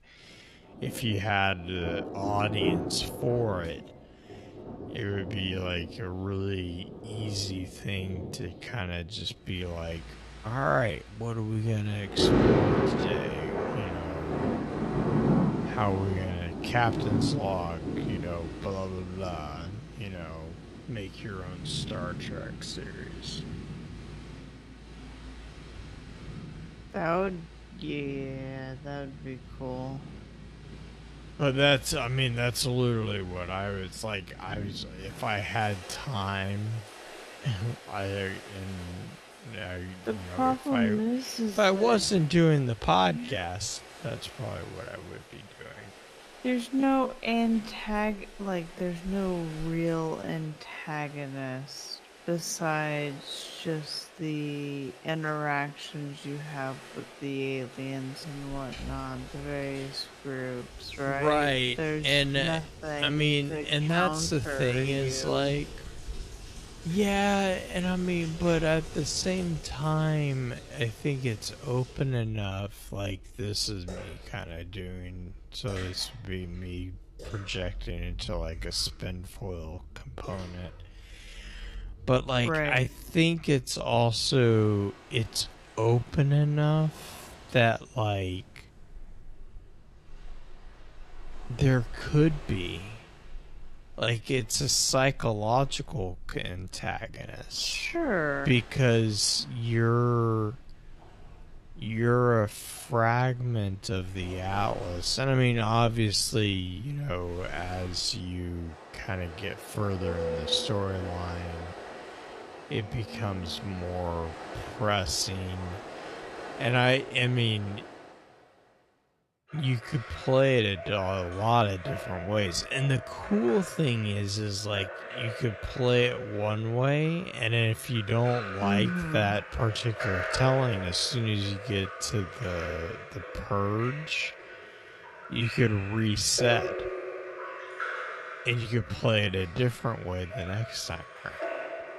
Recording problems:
wrong speed, natural pitch; too slow; 0.5 times normal speed
rain or running water; loud; throughout; 9 dB below the speech

